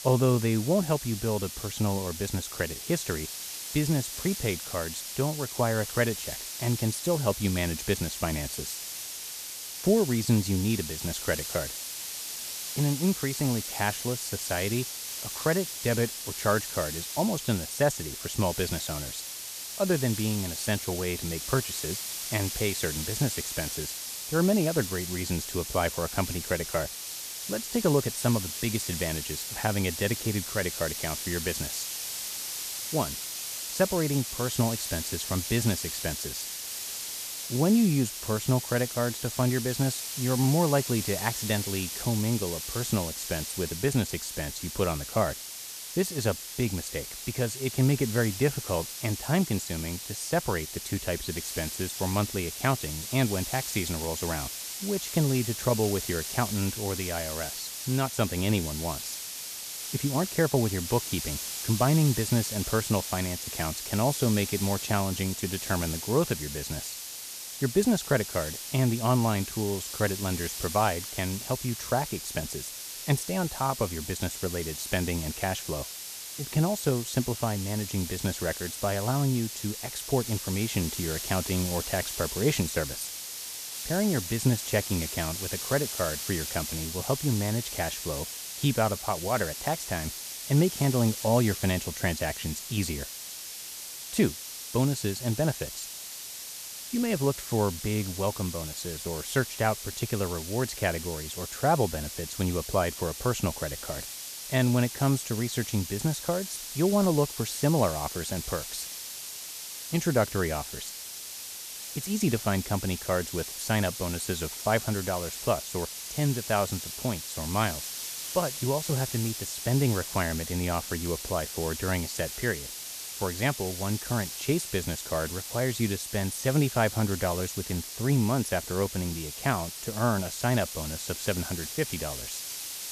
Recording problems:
hiss; loud; throughout; 5 dB below the speech

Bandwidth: 14.5 kHz